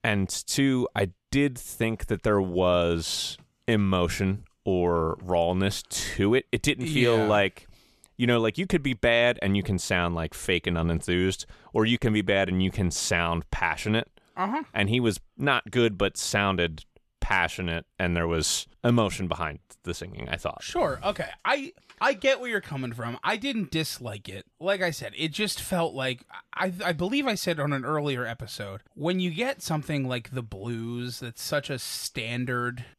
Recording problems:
none

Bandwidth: 13.5 kHz